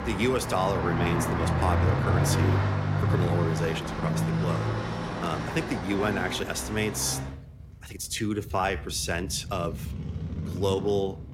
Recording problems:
traffic noise; very loud; throughout; 1 dB above the speech
uneven, jittery; strongly; from 1.5 to 11 s

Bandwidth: 16 kHz